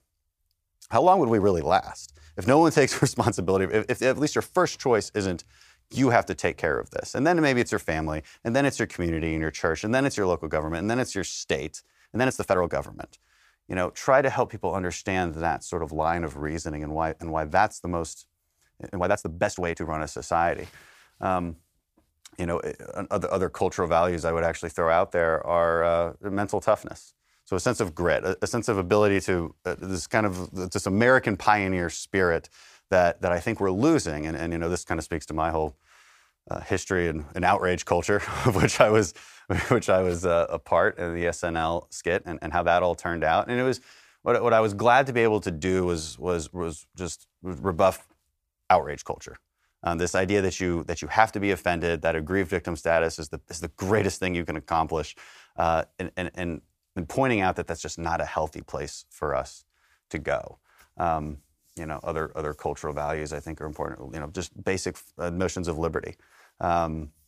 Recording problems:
uneven, jittery; strongly; from 0.5 to 43 s

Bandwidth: 15 kHz